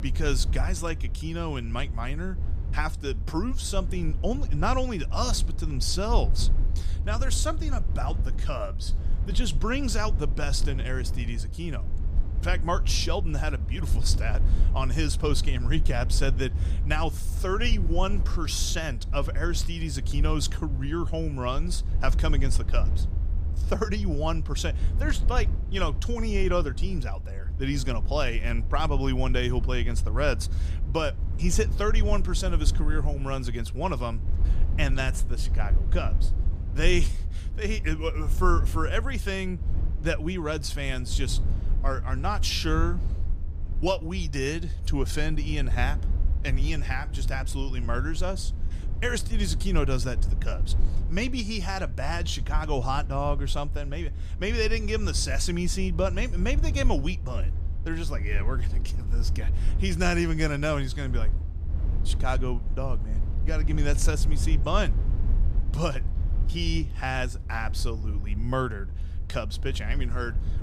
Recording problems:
low rumble; noticeable; throughout; 15 dB below the speech

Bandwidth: 15 kHz